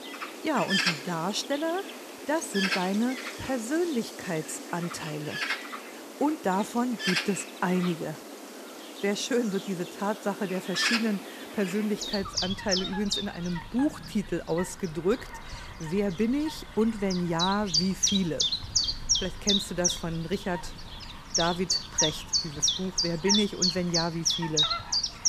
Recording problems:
animal sounds; very loud; throughout; 2 dB above the speech

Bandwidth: 14.5 kHz